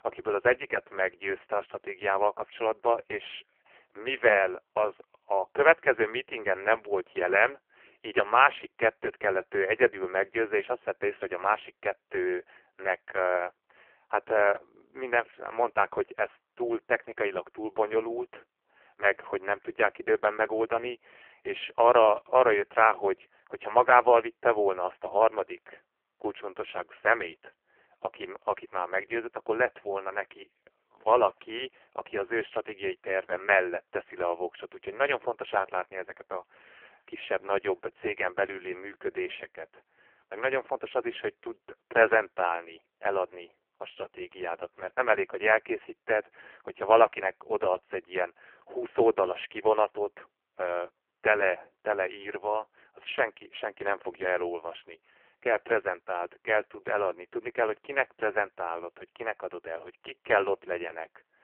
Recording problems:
phone-call audio; poor line
muffled; very slightly; fading above 3 kHz

